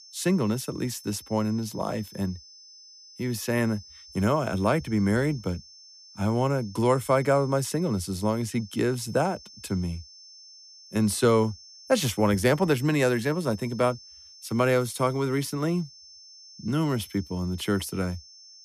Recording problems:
high-pitched whine; faint; throughout; 5.5 kHz, 20 dB below the speech

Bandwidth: 14.5 kHz